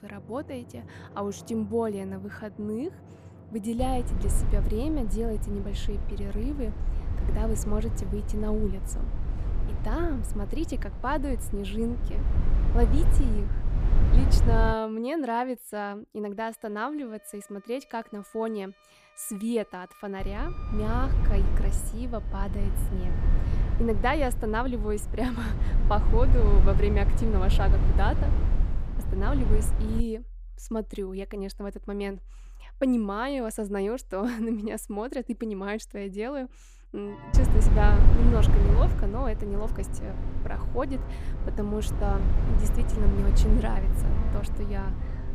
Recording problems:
low rumble; loud; from 4 to 15 s, from 20 to 30 s and from 37 s on; 8 dB below the speech
background music; noticeable; throughout; 15 dB below the speech

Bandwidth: 15 kHz